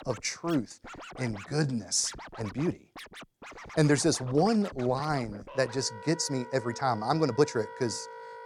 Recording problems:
background music; noticeable; throughout; 15 dB below the speech
uneven, jittery; strongly; from 0.5 to 7.5 s

